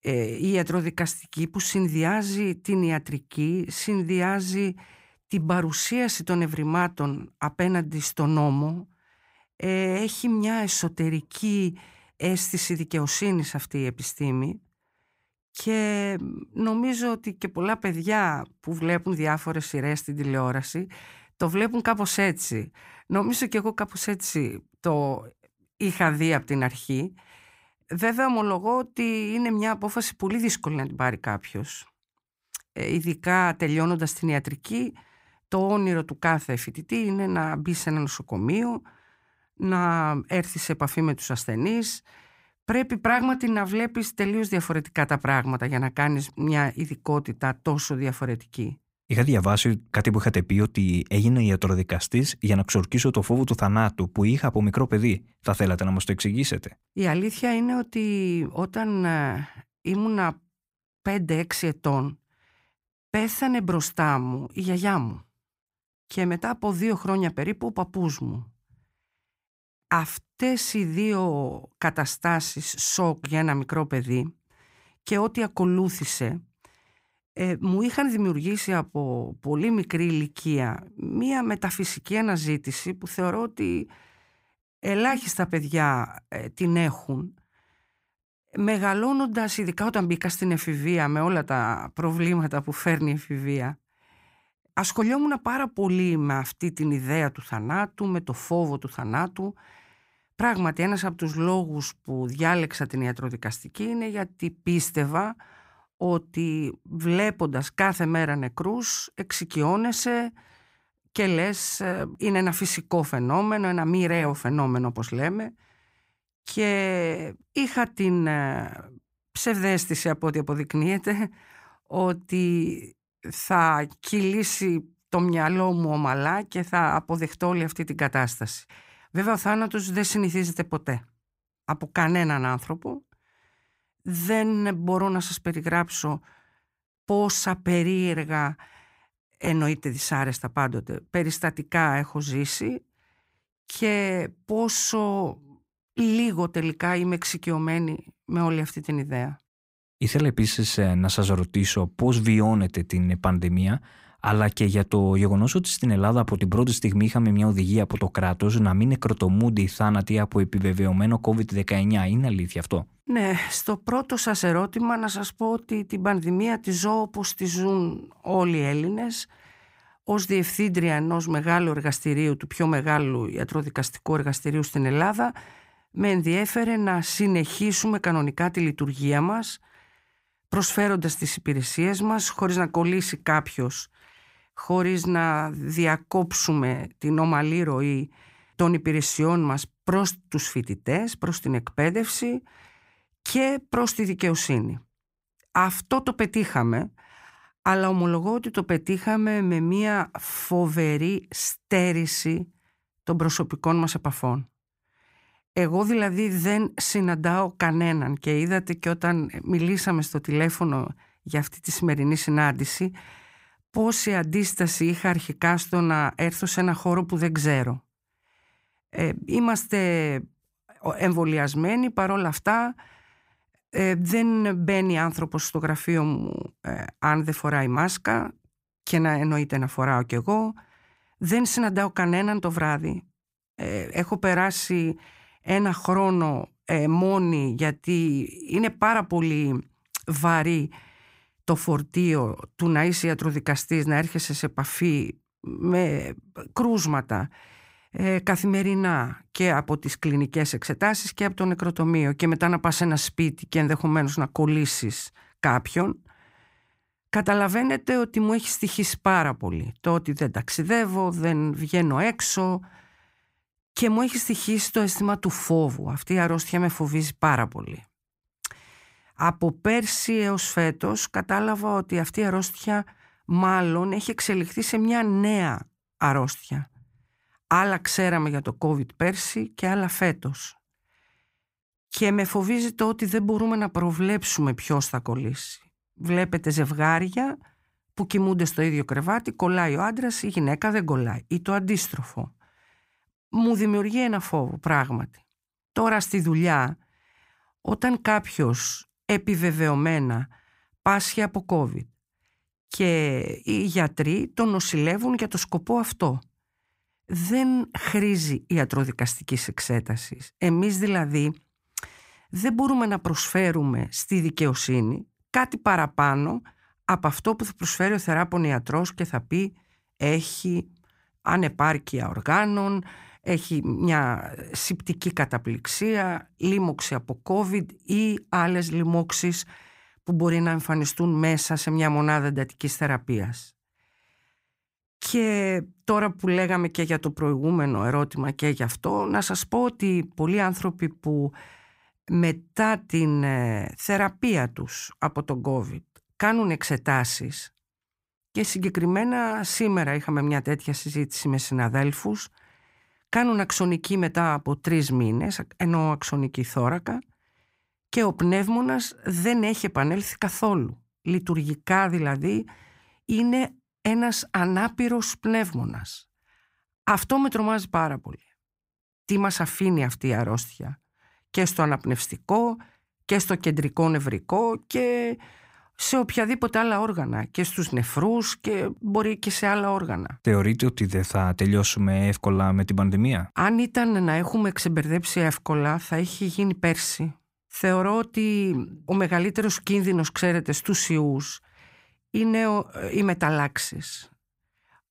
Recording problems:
none

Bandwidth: 15.5 kHz